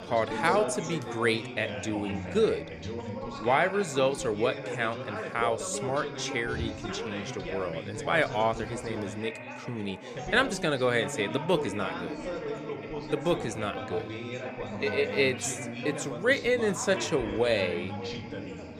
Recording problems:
background chatter; loud; throughout; 3 voices, 7 dB below the speech

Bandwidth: 14.5 kHz